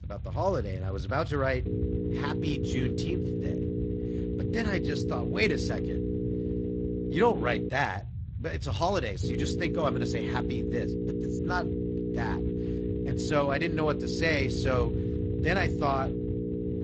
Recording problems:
garbled, watery; slightly; nothing above 7.5 kHz
electrical hum; loud; from 1.5 to 7.5 s and from 9 s on; 60 Hz, 6 dB below the speech
low rumble; faint; throughout; 20 dB below the speech

